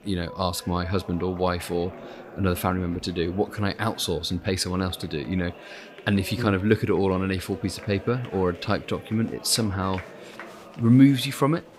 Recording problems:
murmuring crowd; noticeable; throughout; 20 dB below the speech

